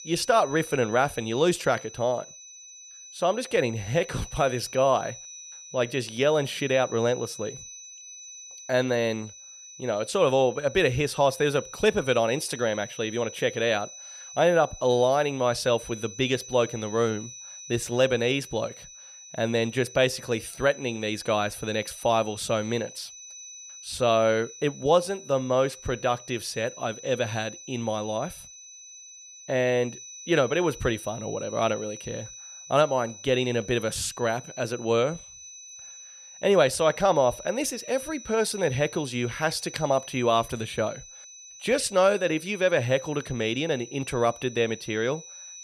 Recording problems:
high-pitched whine; noticeable; throughout; 6 kHz, 15 dB below the speech

